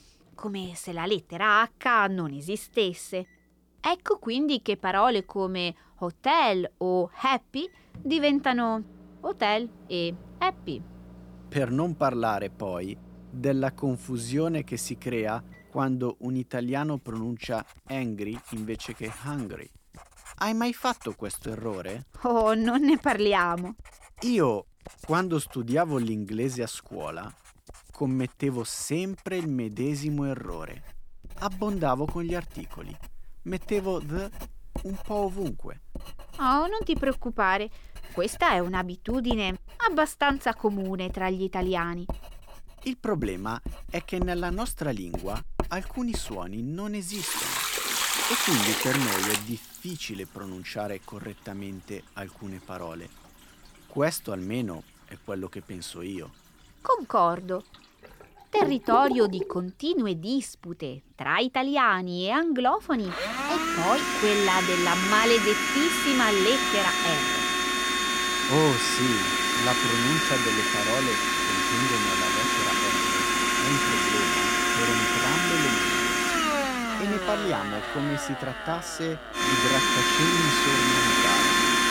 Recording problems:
household noises; very loud; throughout; 4 dB above the speech

